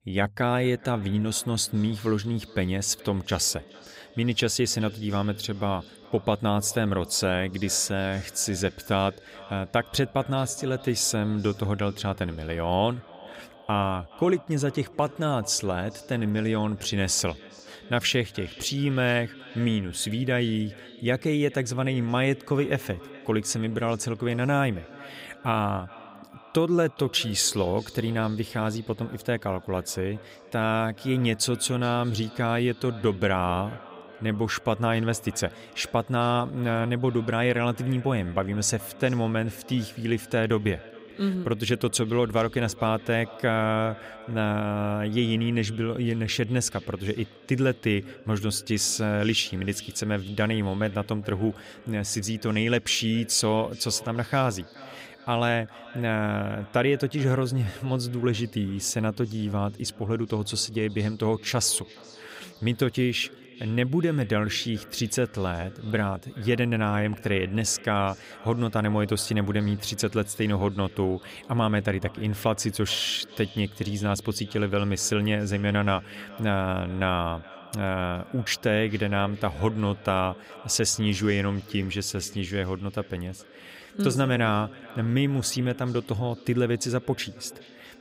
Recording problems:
echo of what is said; faint; throughout; 420 ms later, 20 dB below the speech

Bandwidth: 15.5 kHz